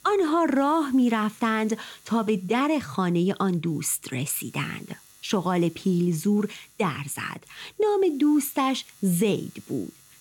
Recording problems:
electrical hum; faint; throughout; 50 Hz, 25 dB below the speech

